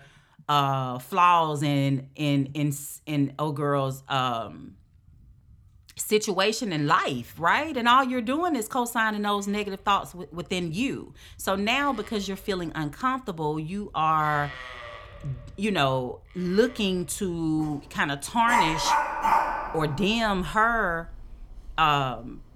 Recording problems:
animal sounds; loud; throughout; 4 dB below the speech

